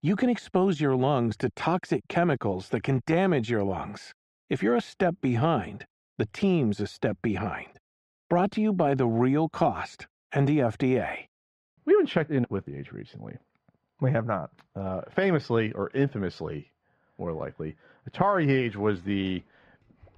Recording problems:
muffled; very; fading above 2.5 kHz

